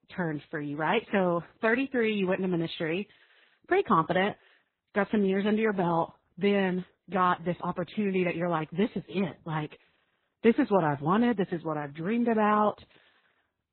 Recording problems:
garbled, watery; badly; nothing above 4 kHz

